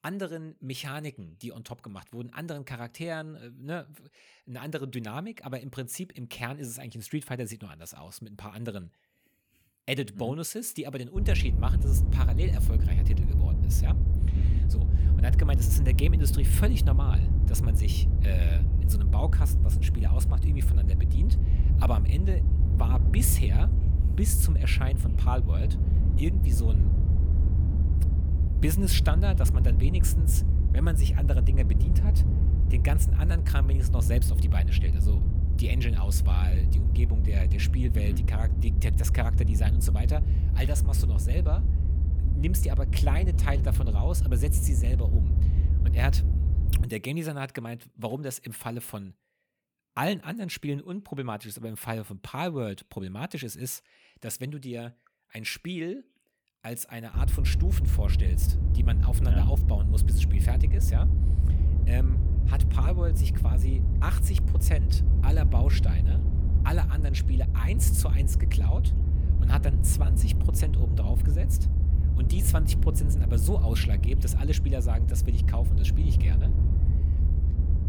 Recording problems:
low rumble; loud; from 11 to 47 s and from 57 s on; 4 dB below the speech

